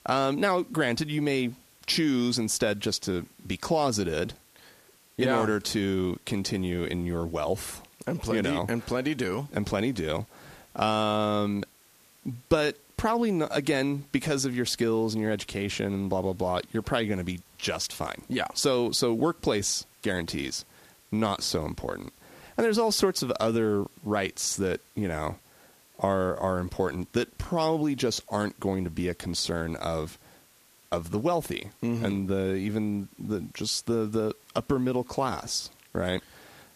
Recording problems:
hiss; faint; throughout; 30 dB below the speech

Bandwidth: 14.5 kHz